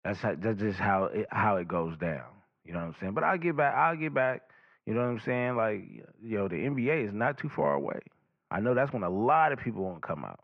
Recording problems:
muffled; very; fading above 2.5 kHz

